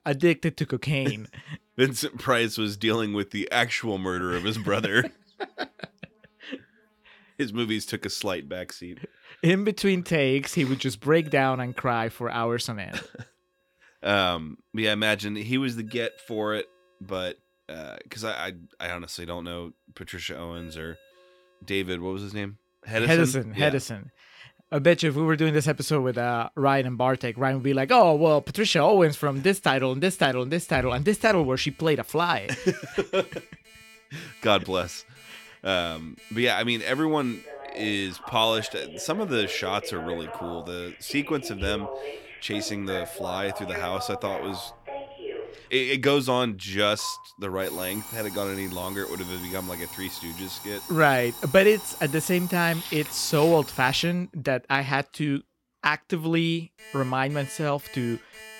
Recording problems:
alarms or sirens; noticeable; throughout; 15 dB below the speech

